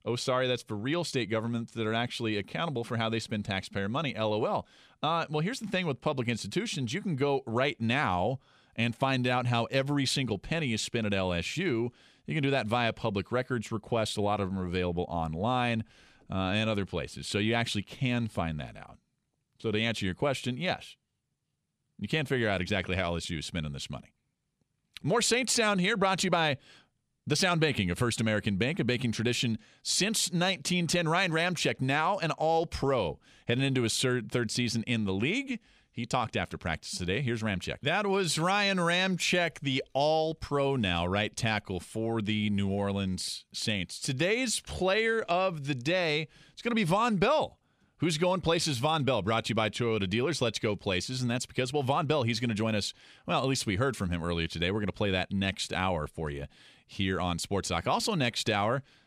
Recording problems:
none

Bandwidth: 15 kHz